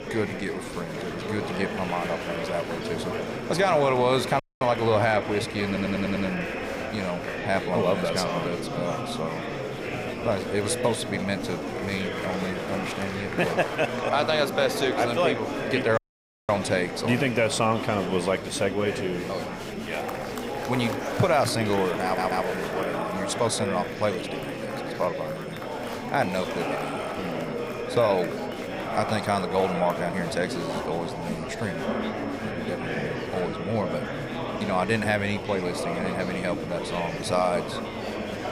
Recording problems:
murmuring crowd; loud; throughout; 4 dB below the speech
electrical hum; faint; throughout; 50 Hz, 30 dB below the speech
high-pitched whine; faint; throughout; 2 kHz, 25 dB below the speech
audio cutting out; at 4.5 s and at 16 s for 0.5 s
audio stuttering; at 5.5 s and at 22 s

